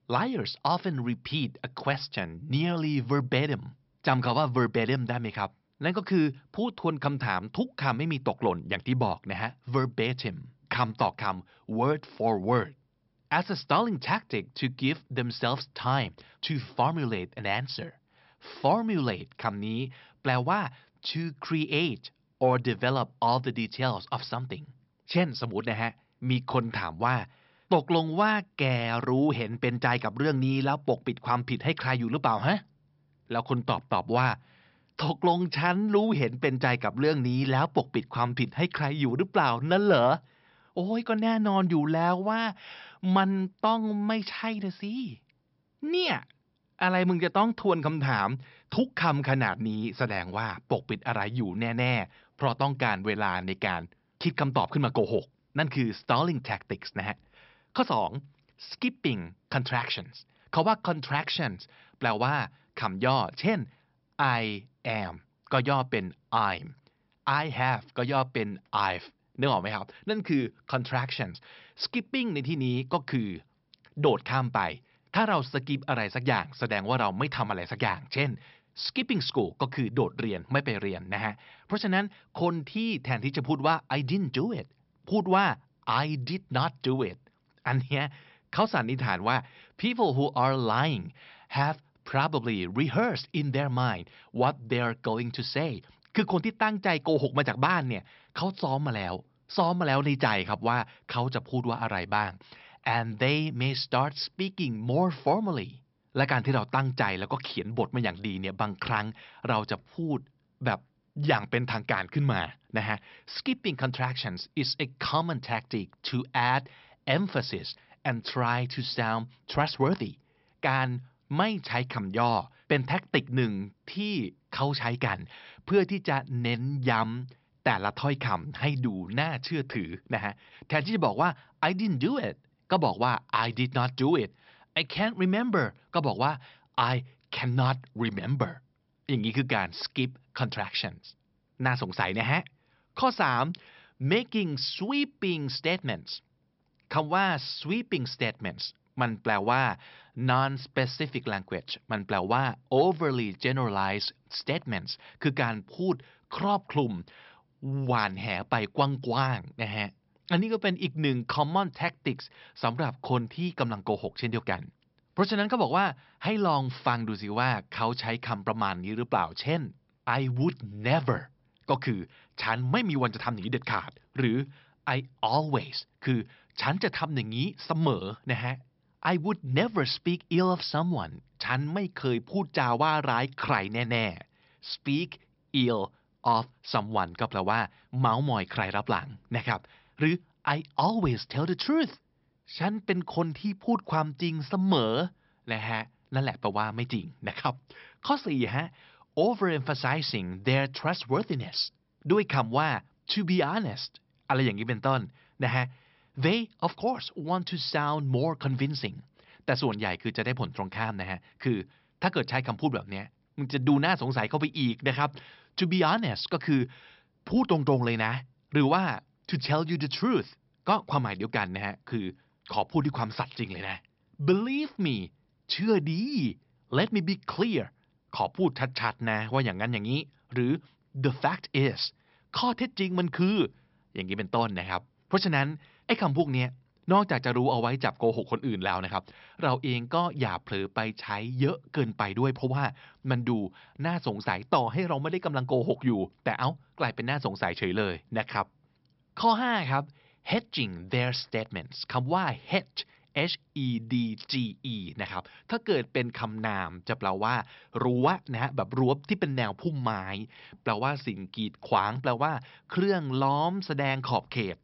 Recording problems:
high frequencies cut off; noticeable; nothing above 5.5 kHz

